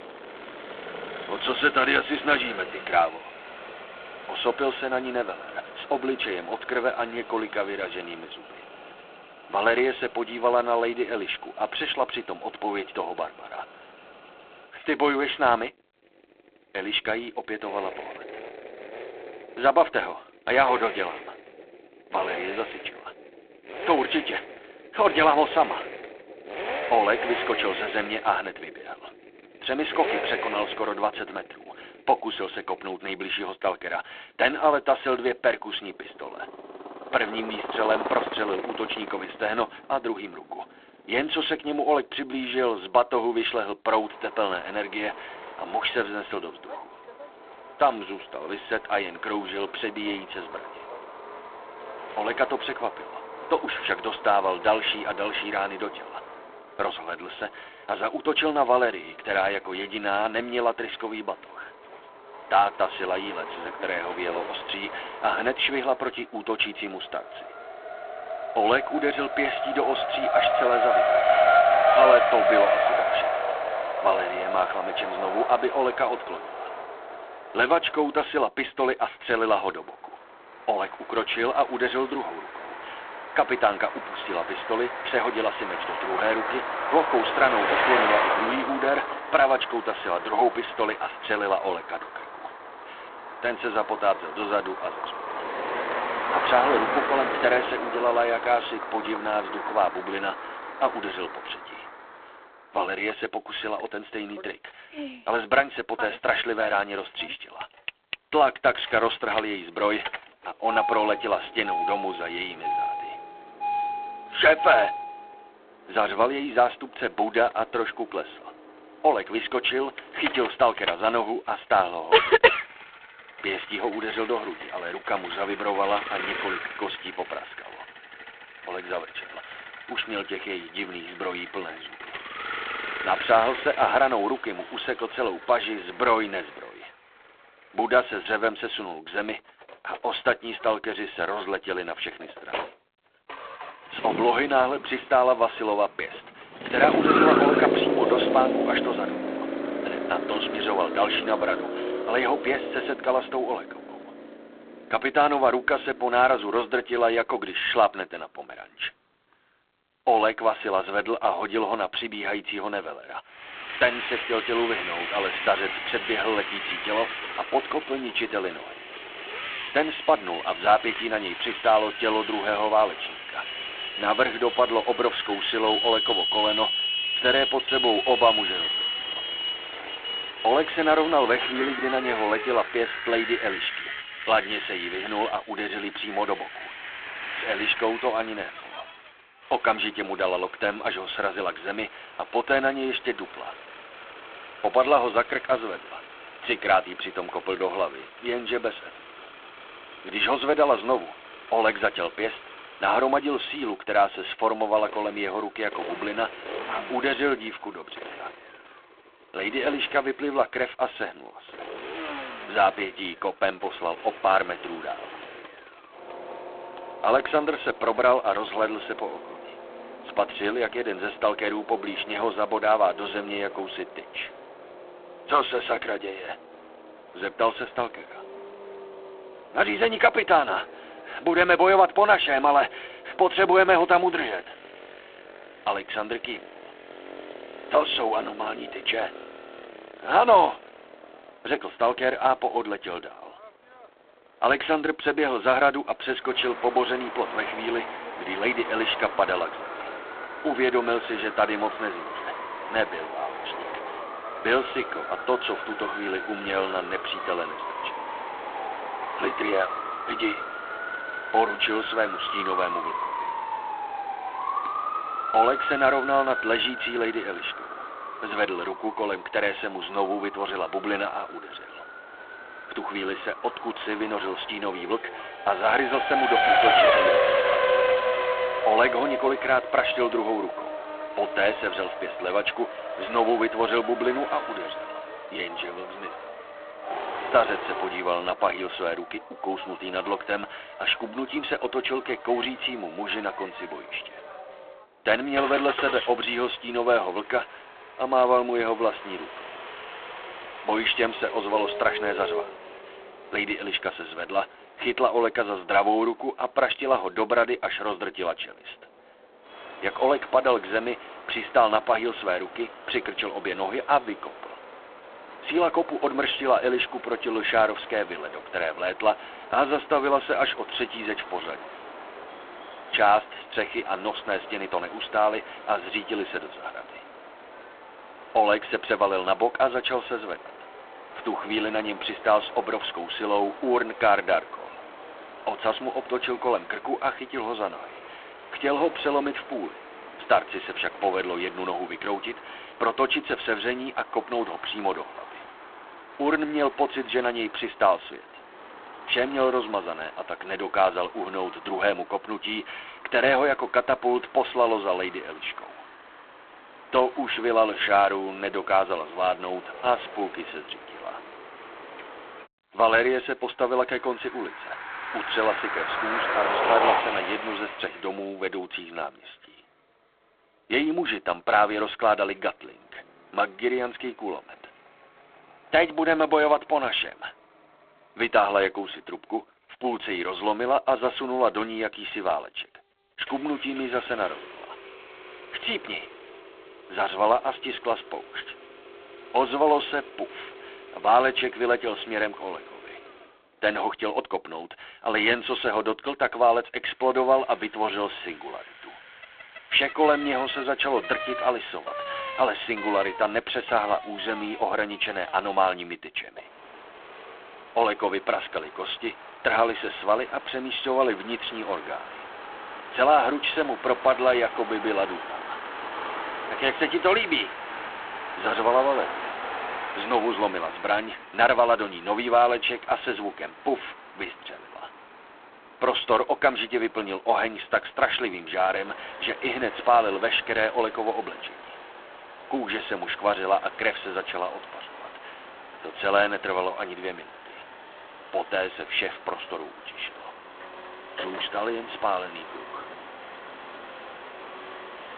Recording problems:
phone-call audio; poor line
traffic noise; loud; throughout; 6 dB below the speech

